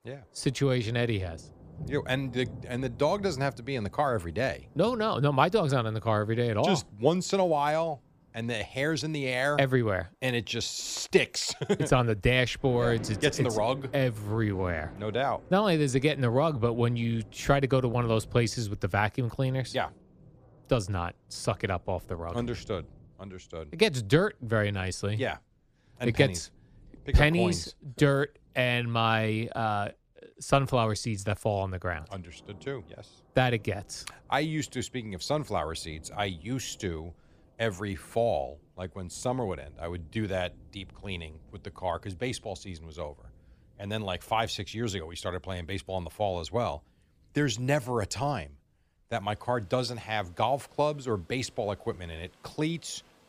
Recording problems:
rain or running water; faint; throughout; 20 dB below the speech

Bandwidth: 15 kHz